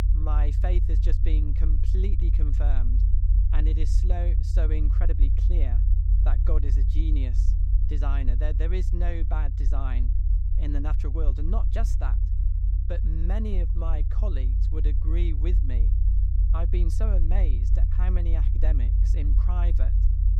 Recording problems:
low rumble; loud; throughout; 5 dB below the speech

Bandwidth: 17.5 kHz